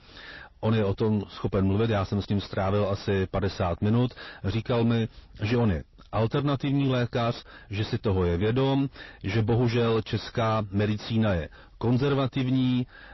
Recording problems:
distortion; heavy; 6 dB below the speech
garbled, watery; slightly; nothing above 5.5 kHz

